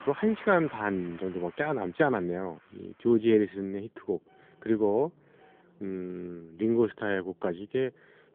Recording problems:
phone-call audio; nothing above 3.5 kHz
traffic noise; faint; throughout; 25 dB below the speech

